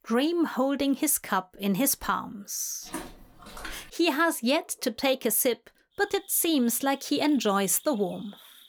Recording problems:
animal sounds; faint; from 5 s on; 25 dB below the speech
footsteps; faint; from 3 to 4 s; peak 15 dB below the speech

